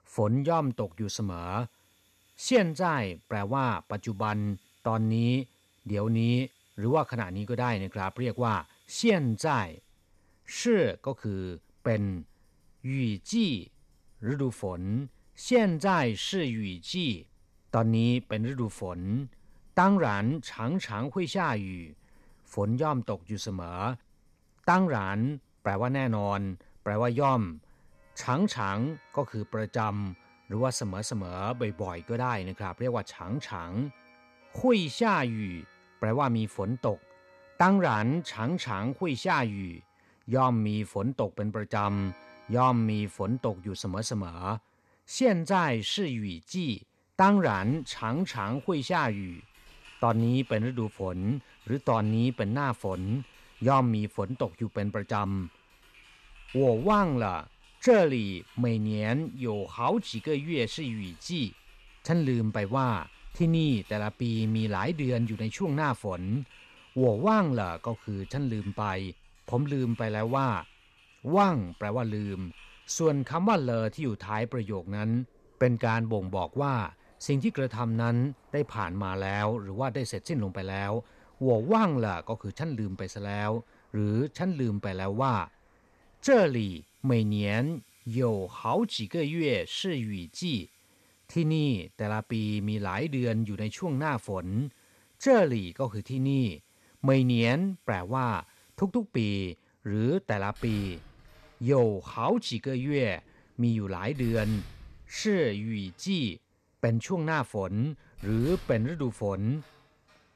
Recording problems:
household noises; faint; throughout; 25 dB below the speech

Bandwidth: 13.5 kHz